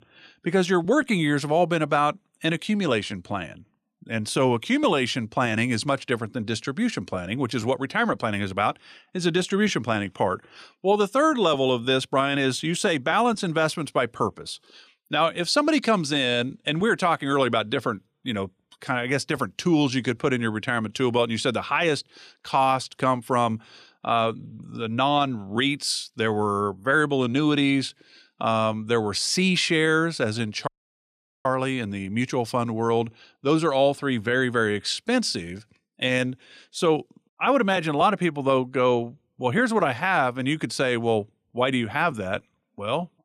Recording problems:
audio cutting out; at 31 s for 1 s

